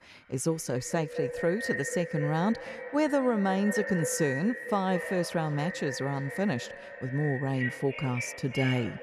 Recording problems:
echo of what is said; strong; throughout; 210 ms later, 7 dB below the speech
alarms or sirens; loud; throughout; 8 dB below the speech

